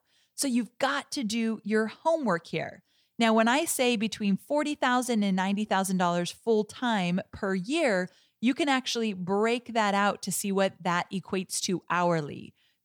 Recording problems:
none

